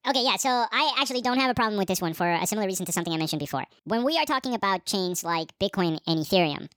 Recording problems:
wrong speed and pitch; too fast and too high; 1.5 times normal speed

